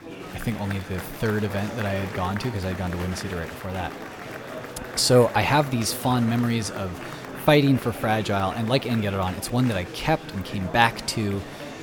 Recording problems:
murmuring crowd; noticeable; throughout; 10 dB below the speech

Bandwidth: 17 kHz